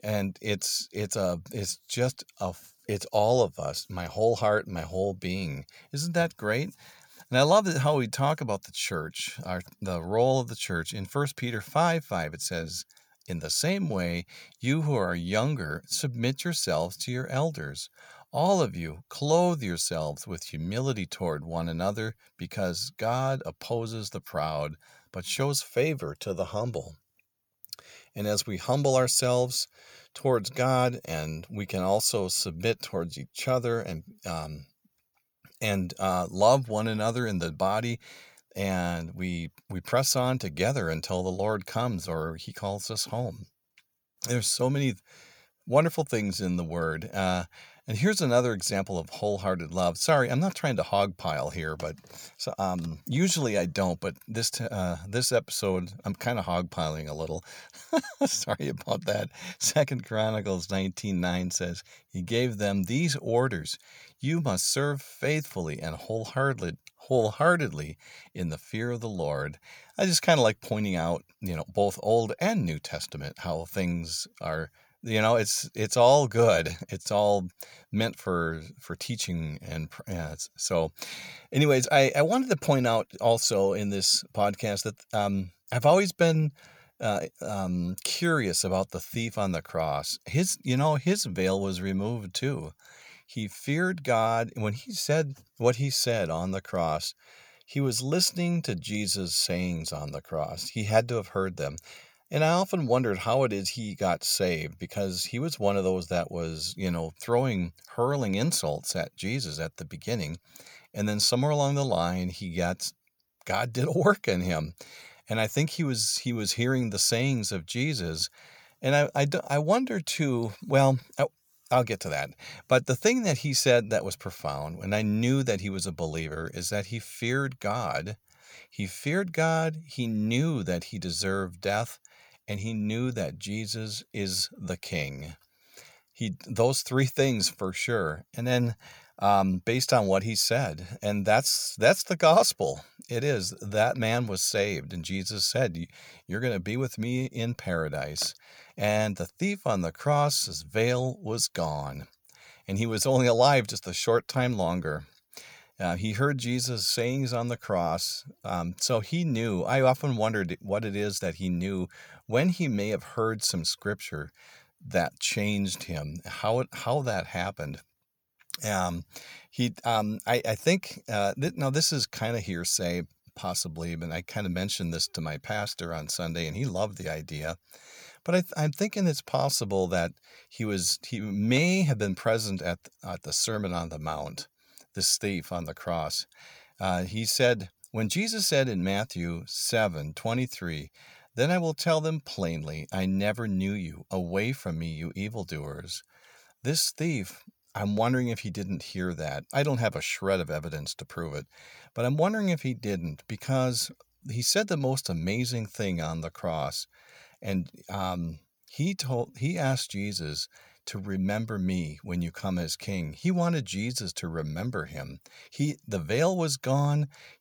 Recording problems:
none

